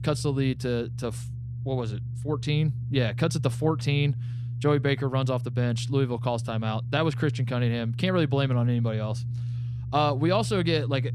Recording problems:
low rumble; noticeable; throughout; 15 dB below the speech

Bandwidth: 13.5 kHz